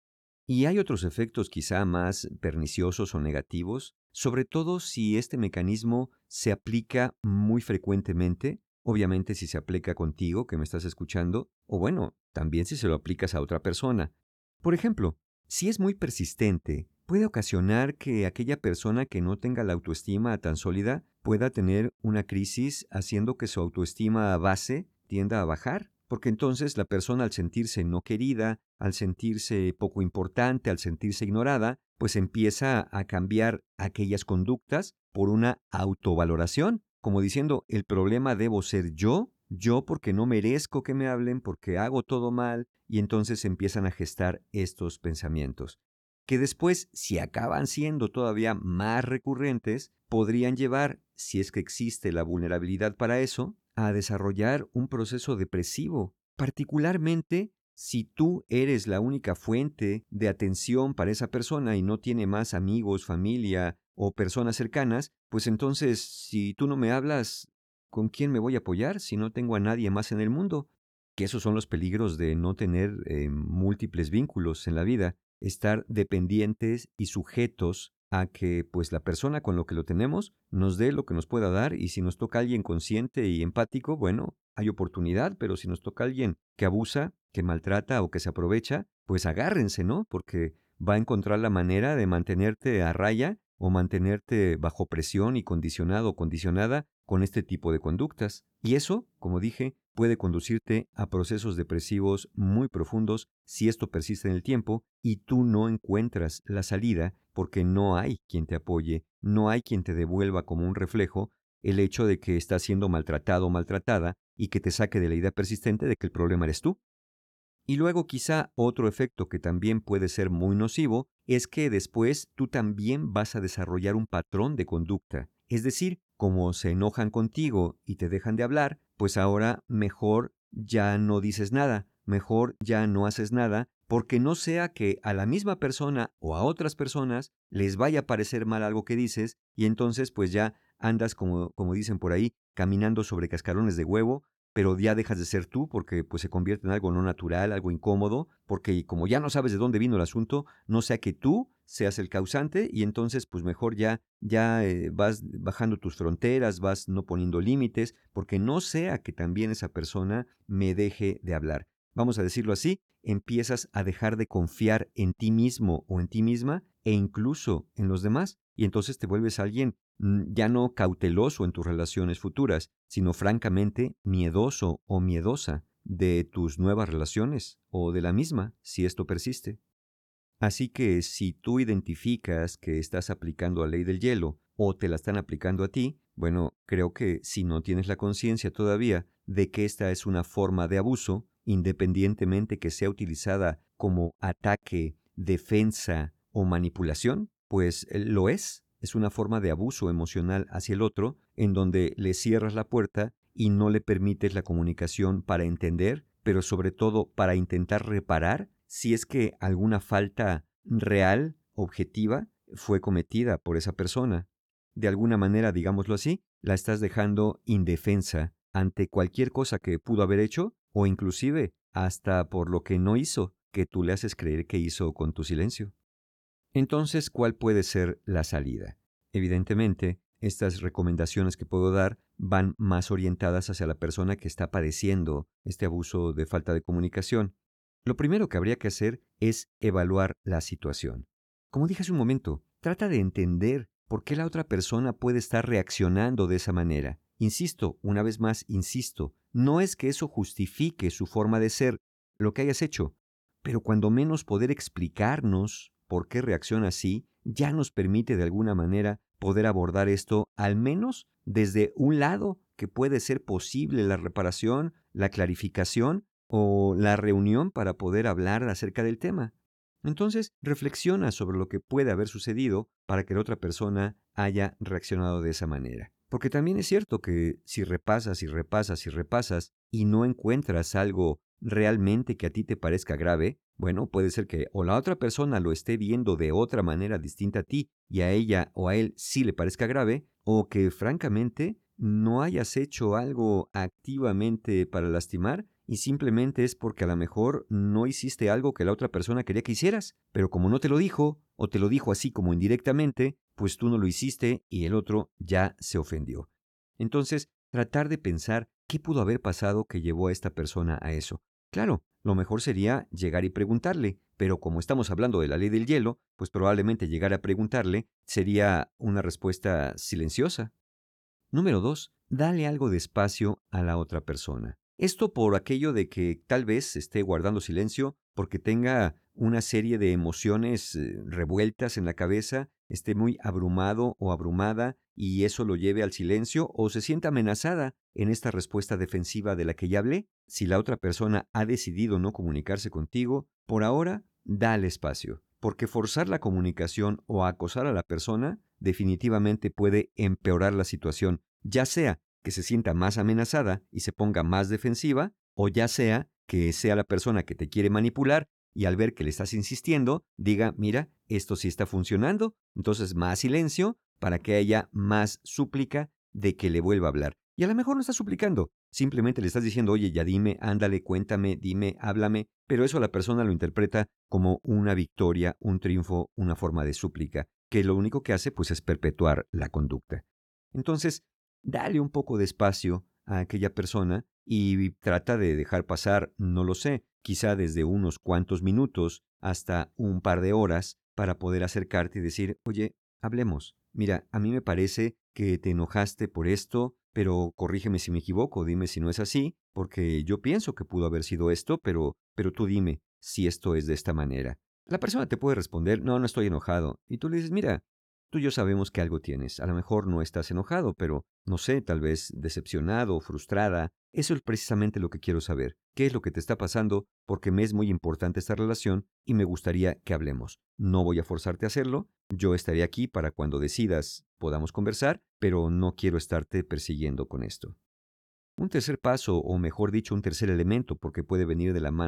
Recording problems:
abrupt cut into speech; at the end

